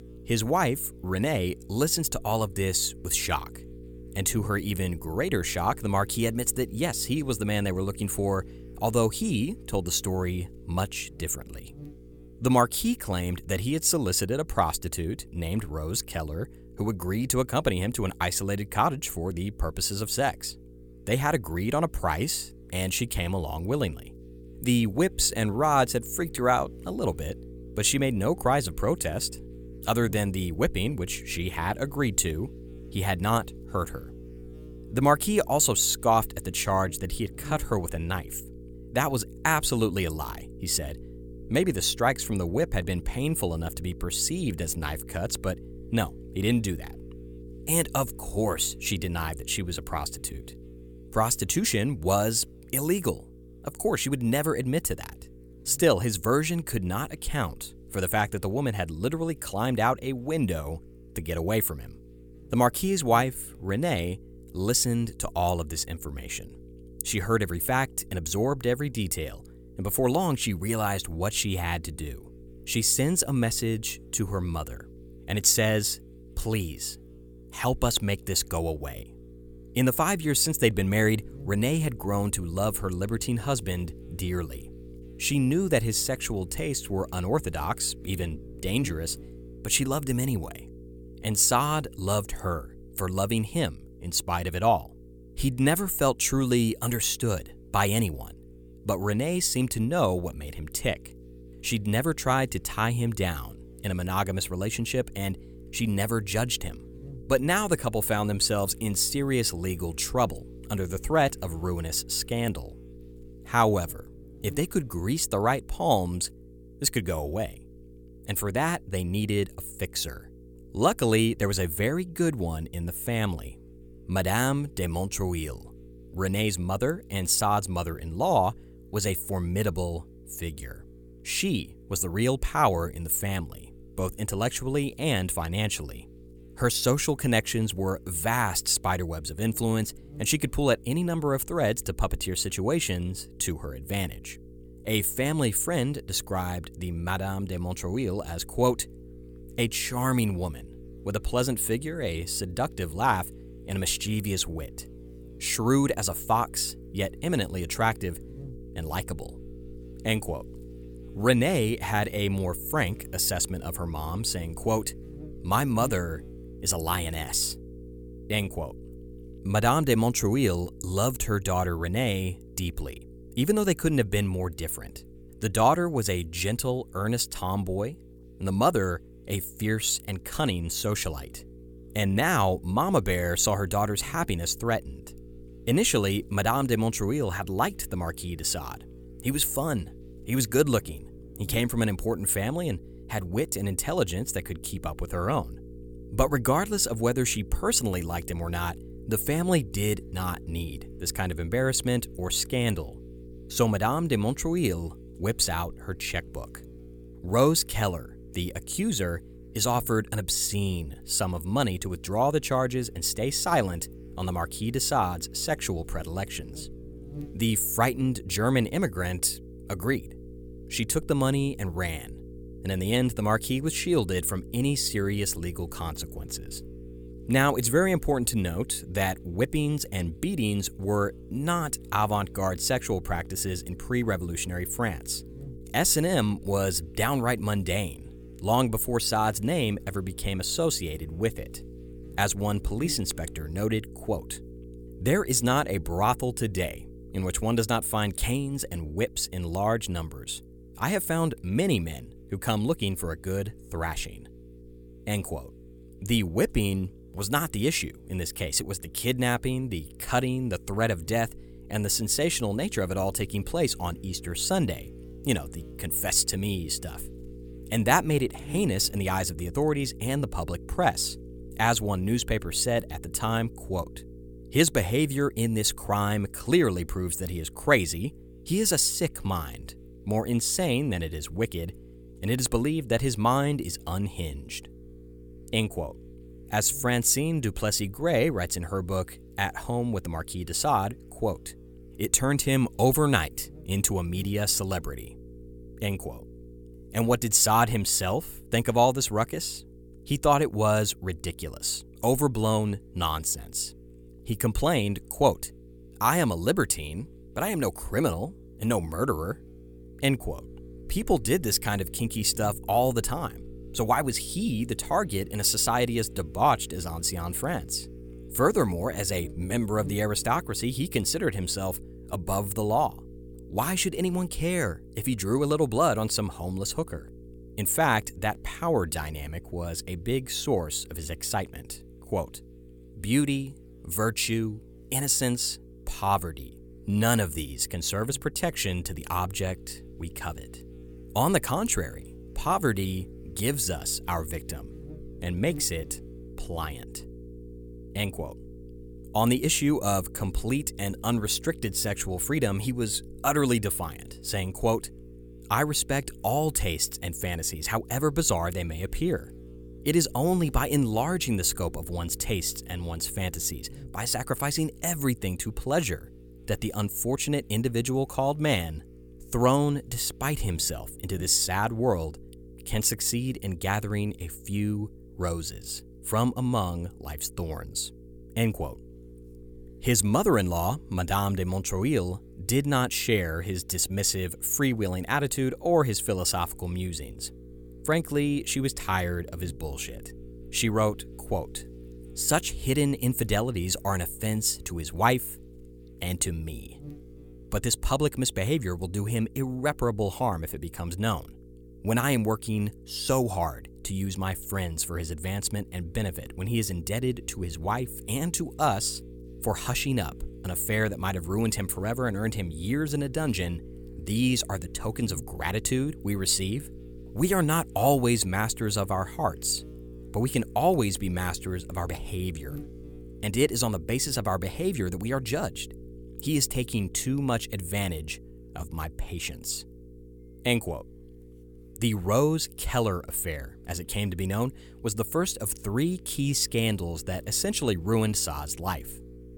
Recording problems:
electrical hum; faint; throughout; 60 Hz, 25 dB below the speech

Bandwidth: 17.5 kHz